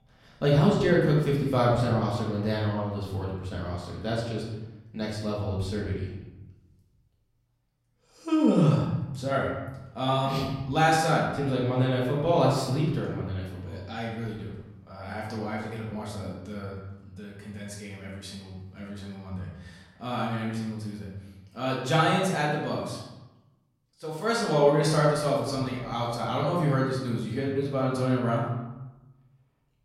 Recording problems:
off-mic speech; far
room echo; noticeable; dies away in 1 s

